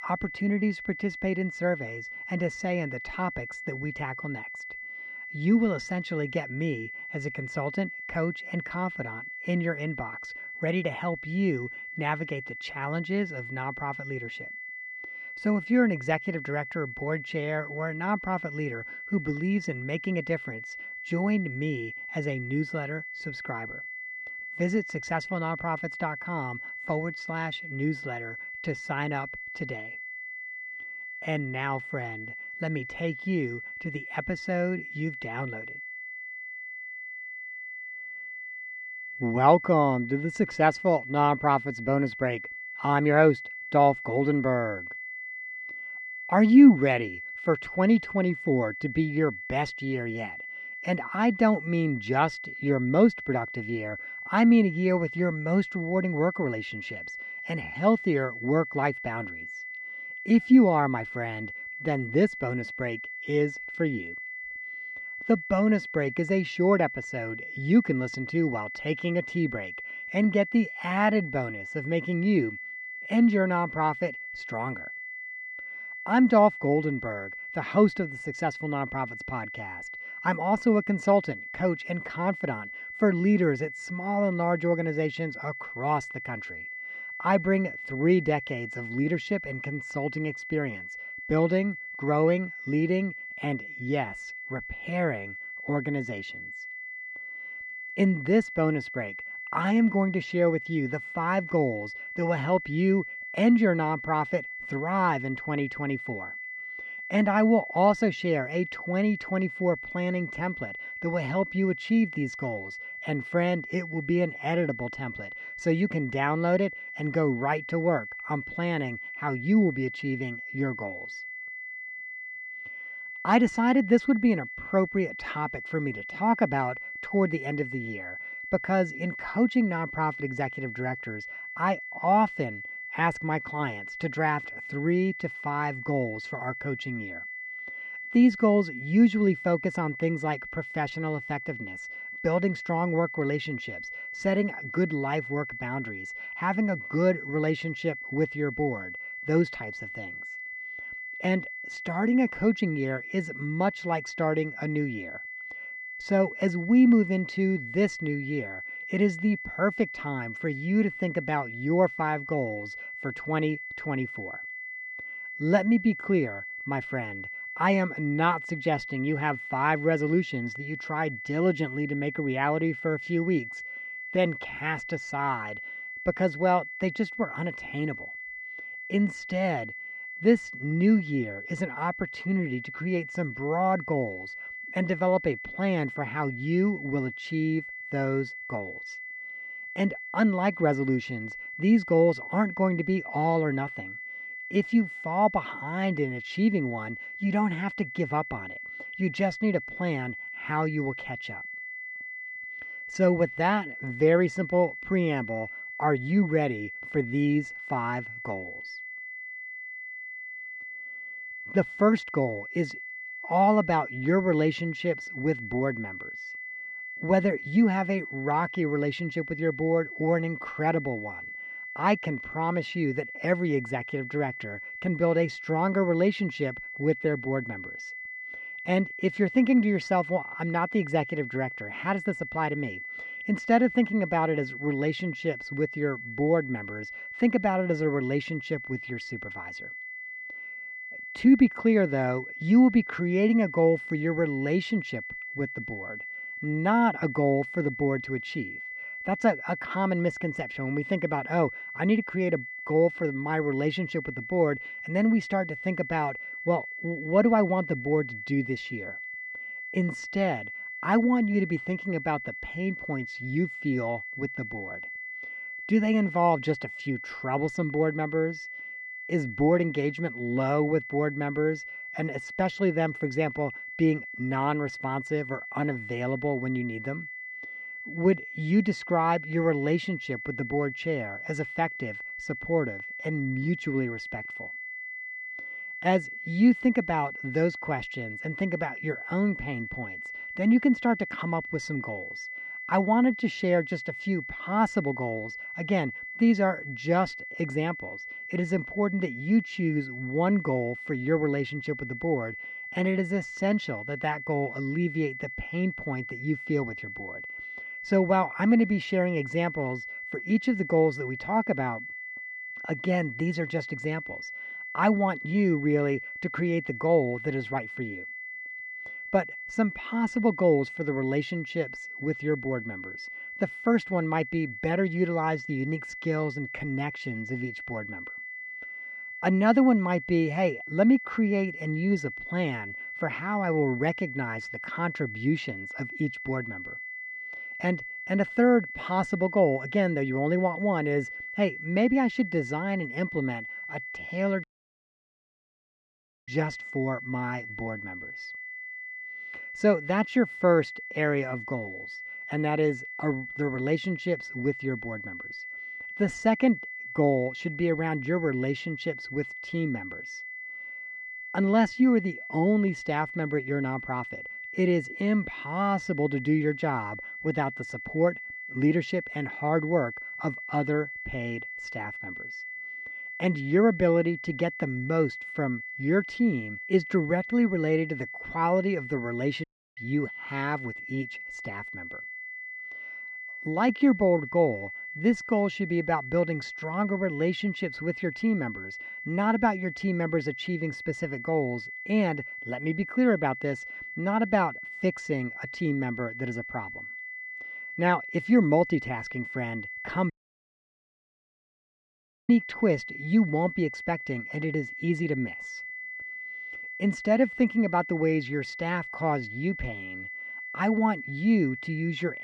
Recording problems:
muffled; slightly; fading above 2.5 kHz
high-pitched whine; loud; throughout; 2 kHz, 9 dB below the speech
audio cutting out; at 5:44 for 2 s, at 6:19 and at 6:40 for 2 s

